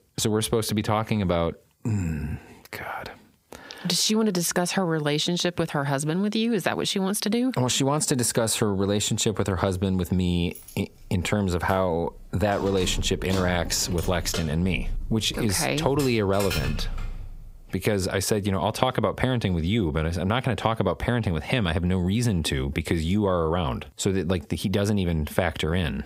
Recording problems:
squashed, flat; heavily
jangling keys; noticeable; from 11 to 18 s; peak 5 dB below the speech

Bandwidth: 15.5 kHz